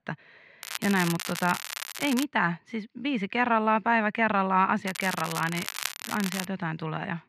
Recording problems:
muffled; slightly; fading above 2.5 kHz
crackling; loud; from 0.5 to 2 s and from 5 to 6.5 s; 8 dB below the speech

